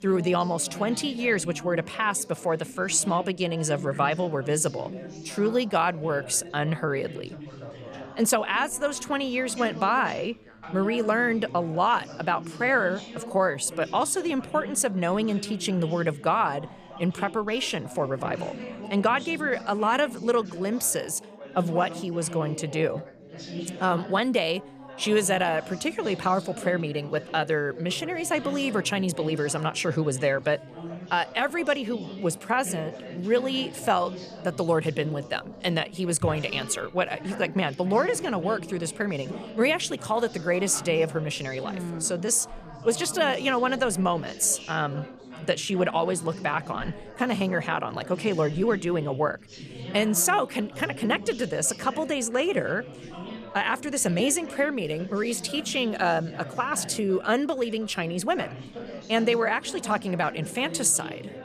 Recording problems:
background chatter; noticeable; throughout; 4 voices, 15 dB below the speech

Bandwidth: 14.5 kHz